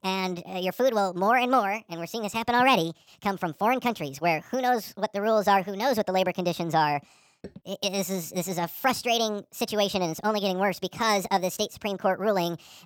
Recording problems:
wrong speed and pitch; too fast and too high; 1.5 times normal speed

